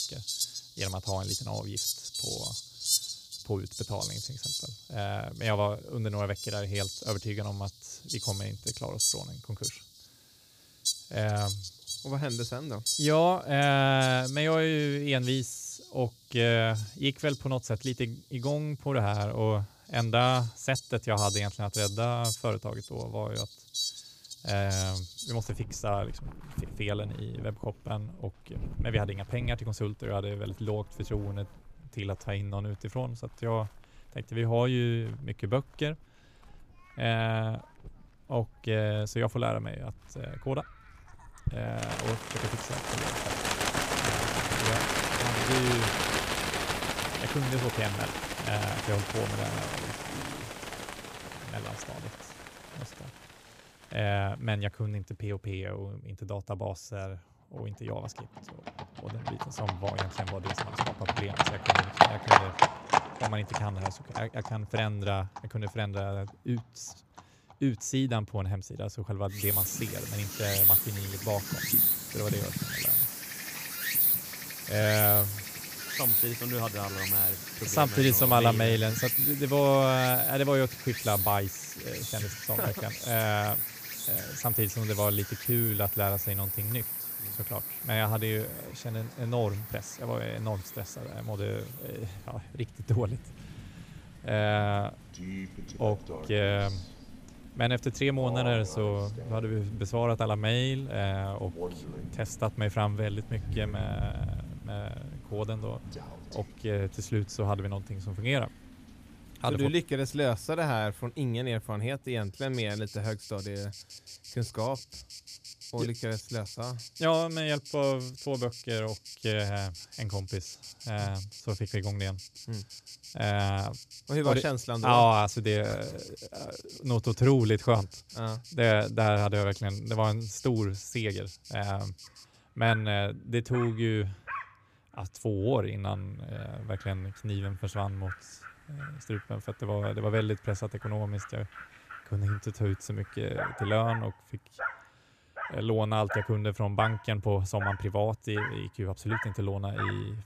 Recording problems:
animal sounds; loud; throughout; as loud as the speech

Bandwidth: 15 kHz